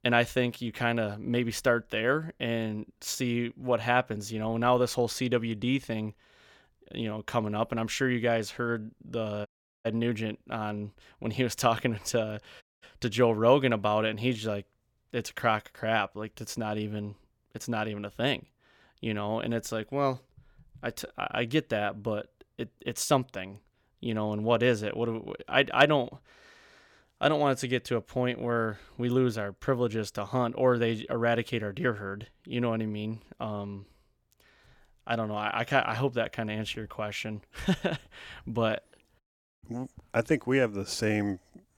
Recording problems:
audio cutting out; at 9.5 s, at 13 s and at 39 s

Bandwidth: 17.5 kHz